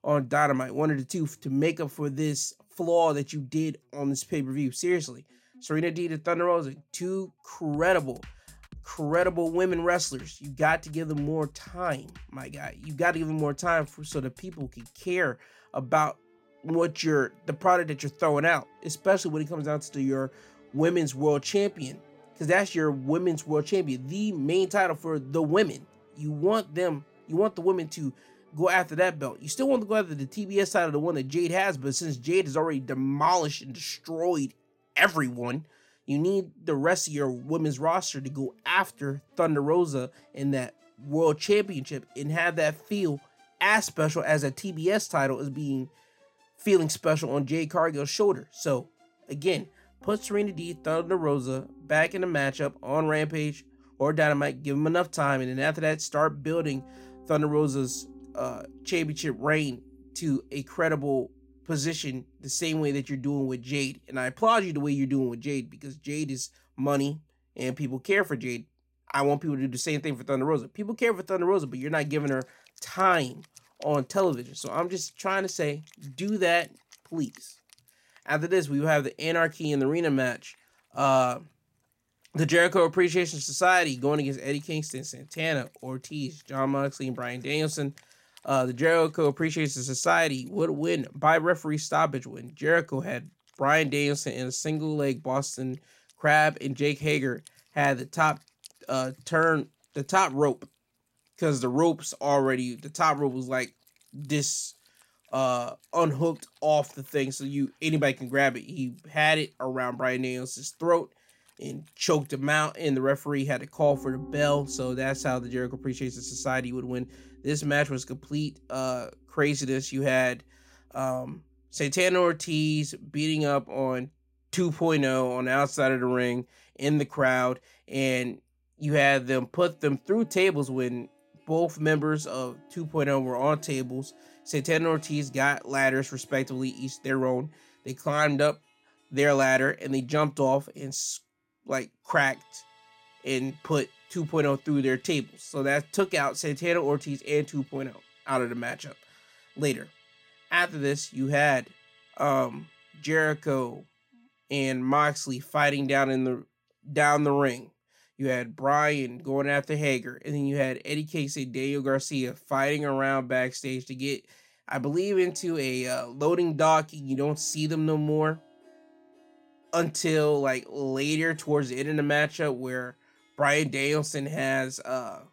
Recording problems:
background music; faint; throughout; 30 dB below the speech

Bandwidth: 16 kHz